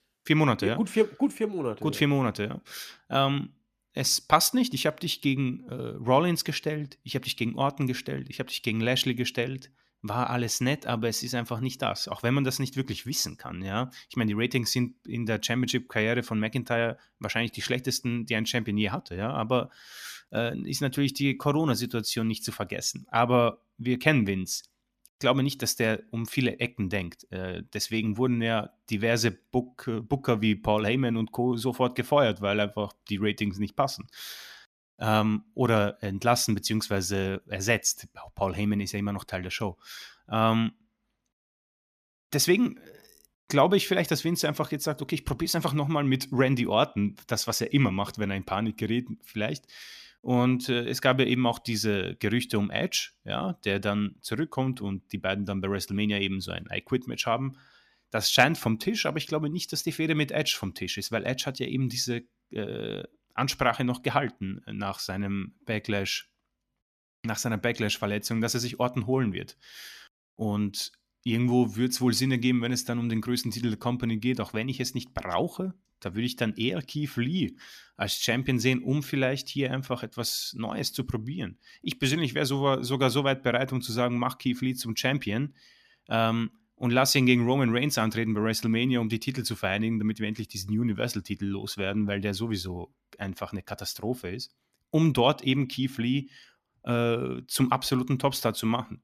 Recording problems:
none

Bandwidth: 14.5 kHz